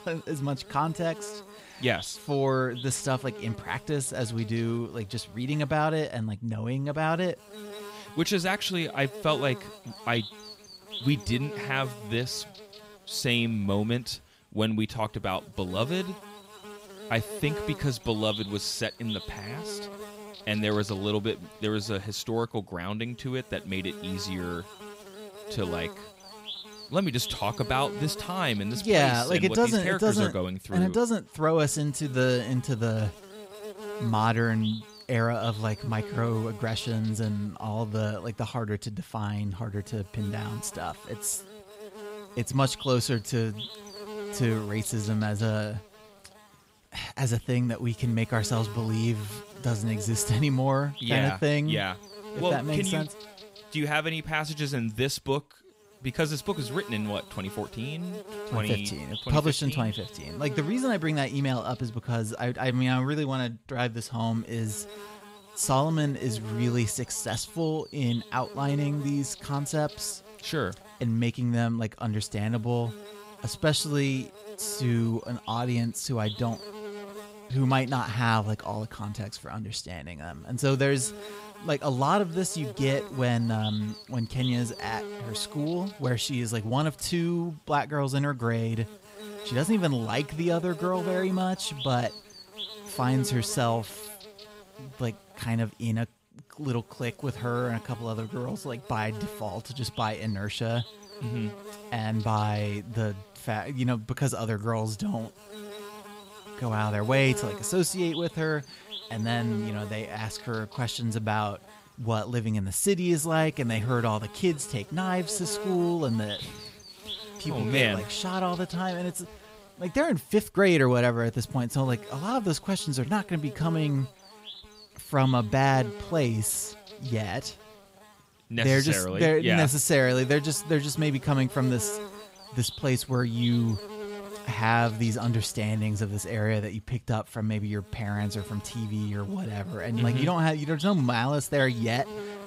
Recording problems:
electrical hum; noticeable; throughout; 50 Hz, 15 dB below the speech

